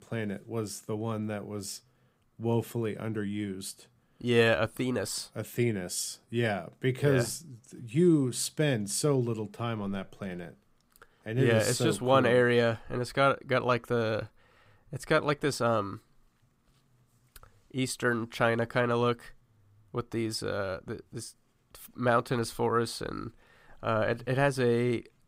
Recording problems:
none

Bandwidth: 15.5 kHz